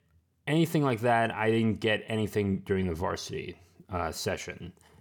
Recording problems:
none

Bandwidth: 18.5 kHz